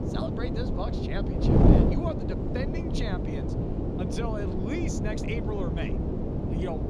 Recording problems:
wind noise on the microphone; heavy; 3 dB above the speech

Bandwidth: 15 kHz